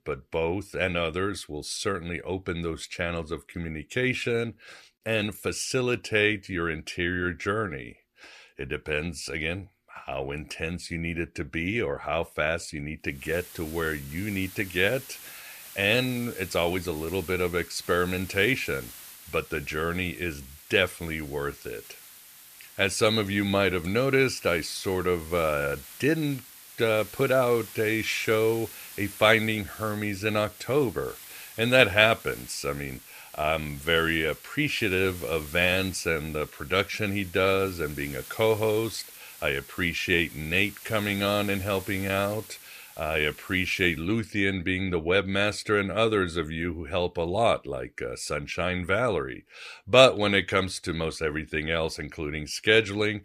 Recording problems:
hiss; noticeable; from 13 to 44 s; 15 dB below the speech

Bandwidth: 14.5 kHz